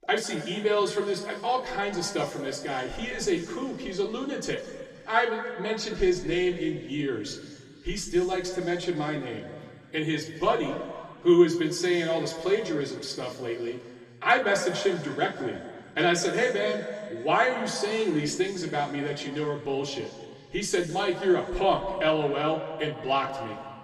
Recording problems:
room echo; slight; dies away in 2.1 s
off-mic speech; somewhat distant

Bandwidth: 14.5 kHz